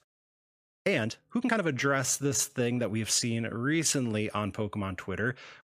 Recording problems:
uneven, jittery; strongly; from 0.5 to 4 s

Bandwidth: 15 kHz